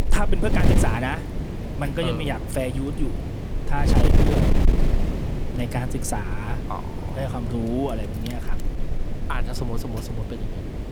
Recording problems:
wind noise on the microphone; heavy; 3 dB below the speech

